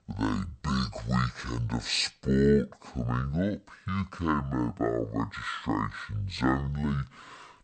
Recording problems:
wrong speed and pitch; too slow and too low; 0.5 times normal speed

